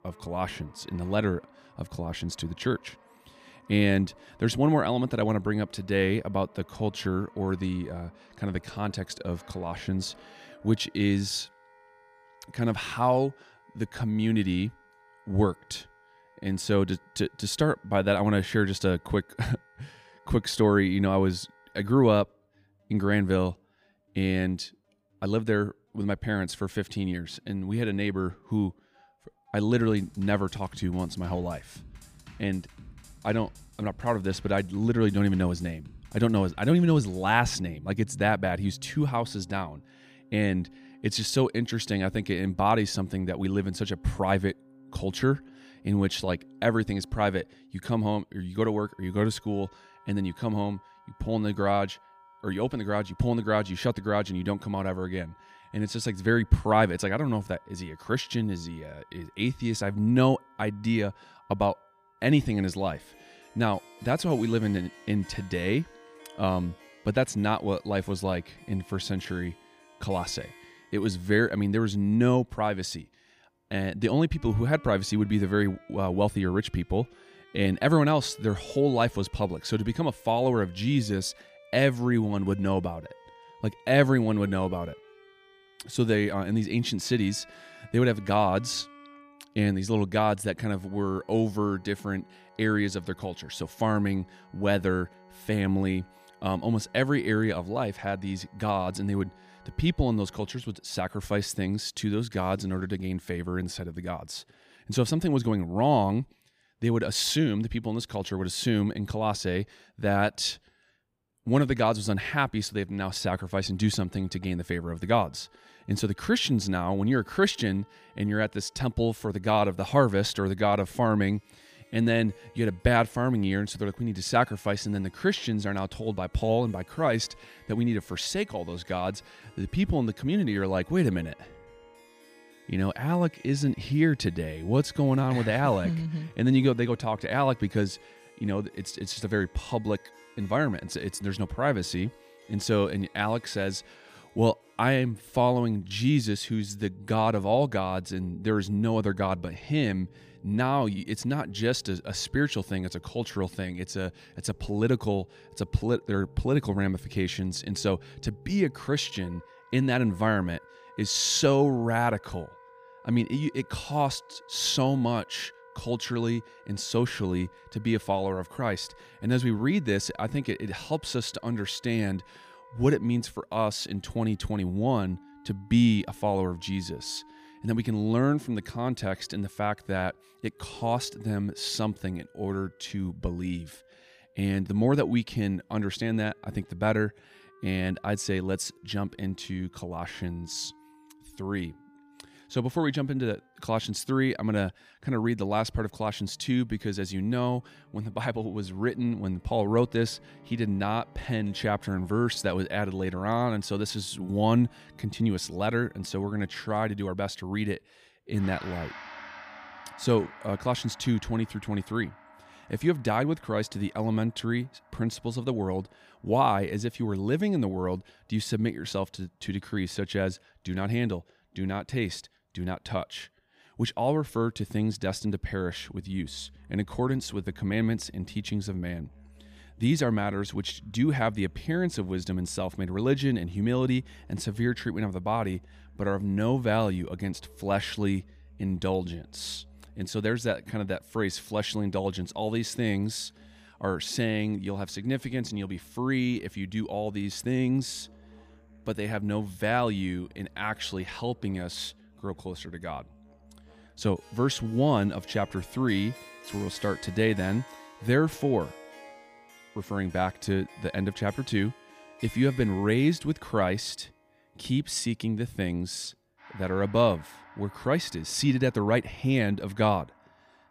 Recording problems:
background music; faint; throughout; 25 dB below the speech

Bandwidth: 15 kHz